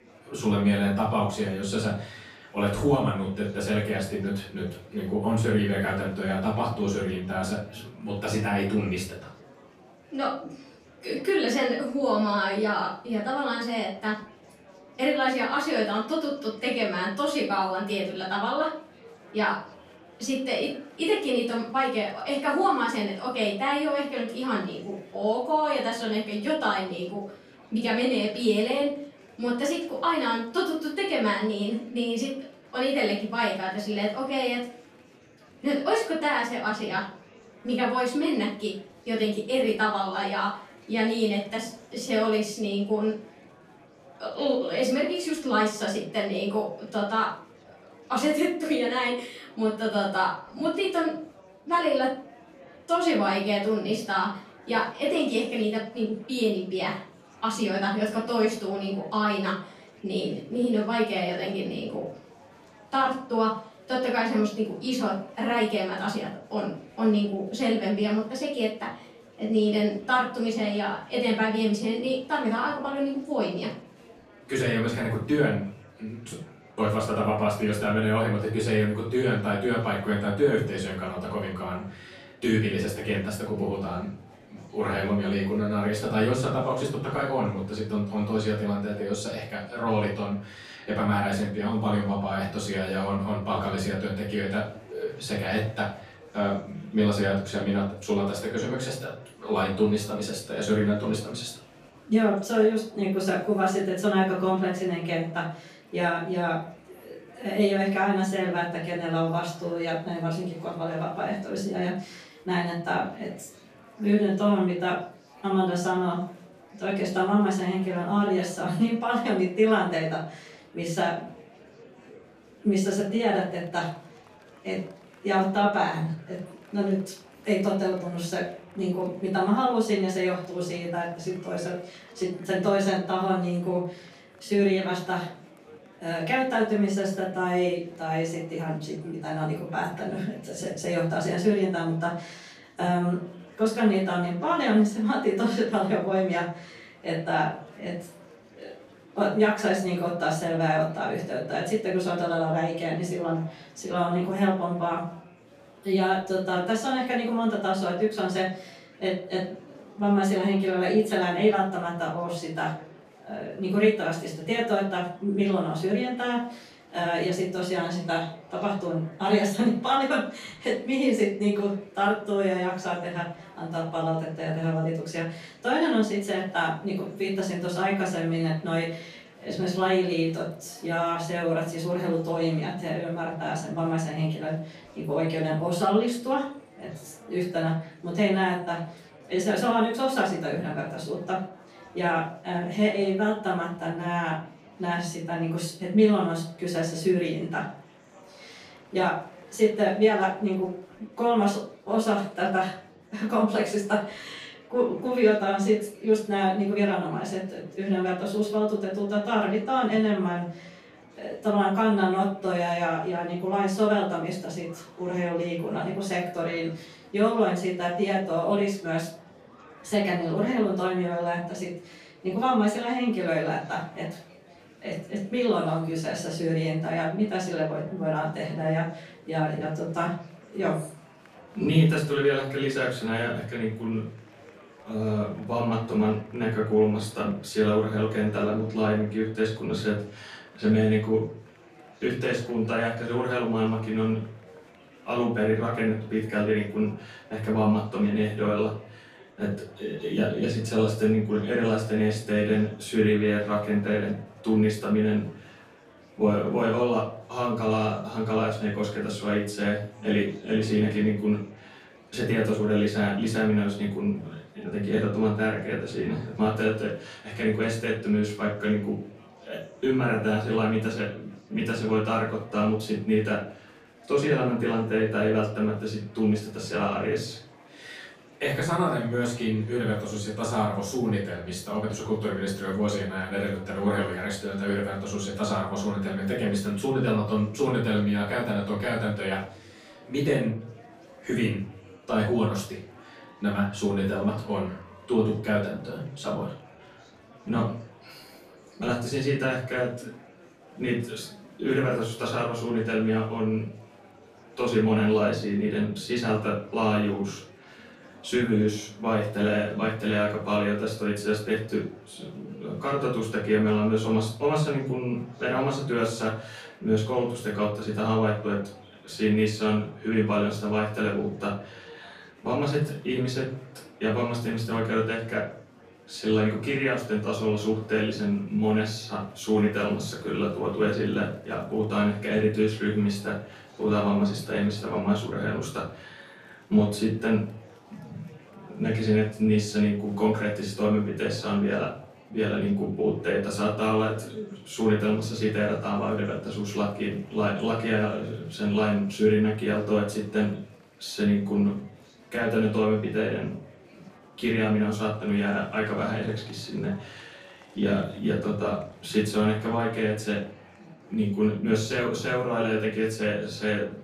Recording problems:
off-mic speech; far
room echo; noticeable; dies away in 0.4 s
murmuring crowd; faint; throughout; 25 dB below the speech

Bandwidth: 14.5 kHz